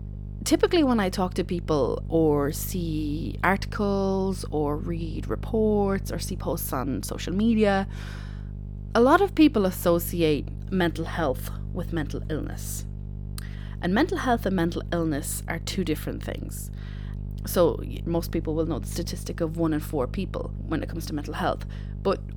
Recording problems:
electrical hum; faint; throughout; 50 Hz, 20 dB below the speech

